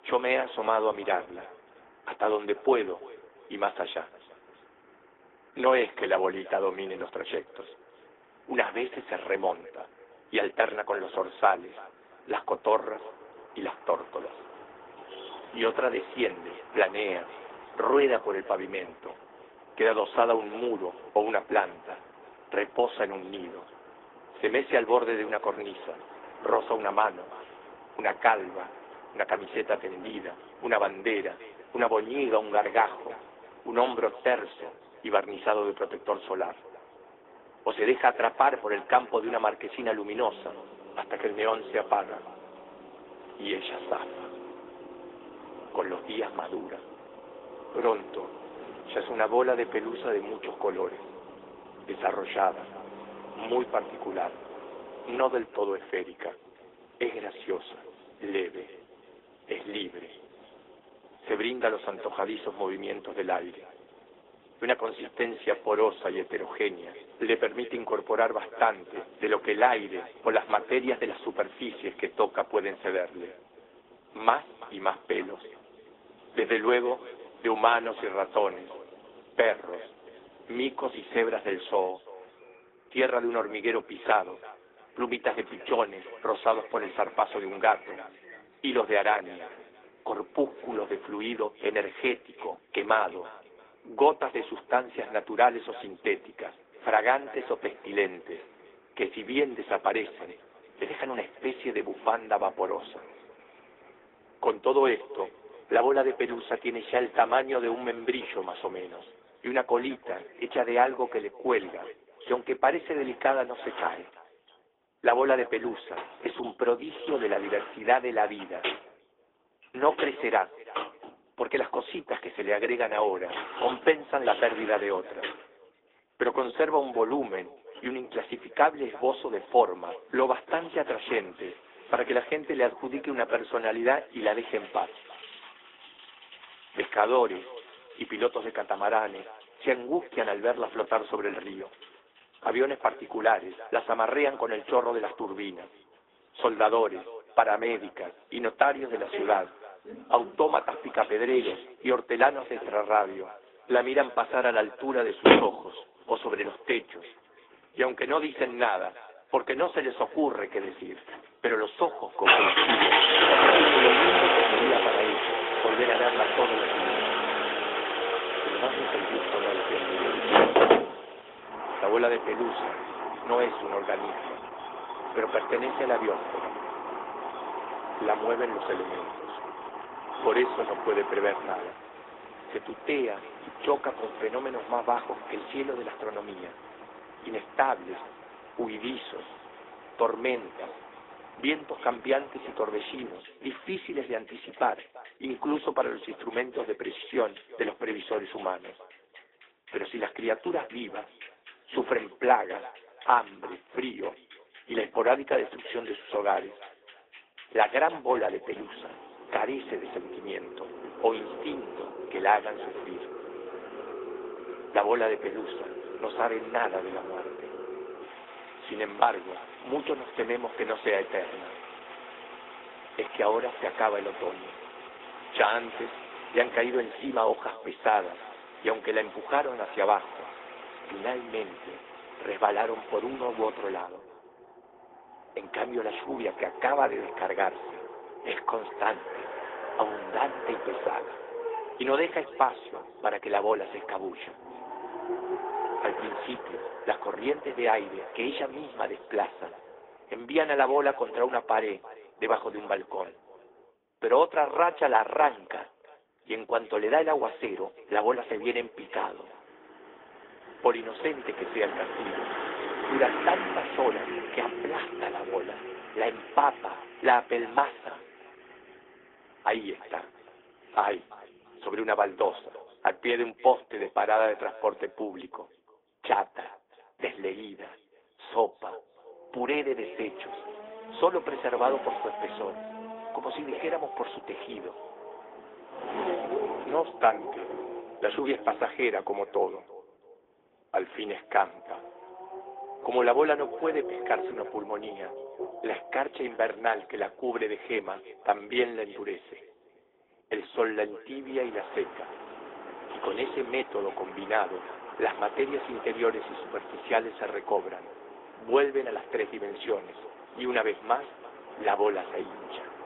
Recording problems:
thin; very; fading below 300 Hz
high frequencies cut off; severe; nothing above 3.5 kHz
echo of what is said; faint; throughout; 340 ms later, 20 dB below the speech
garbled, watery; slightly
traffic noise; loud; throughout; 3 dB below the speech

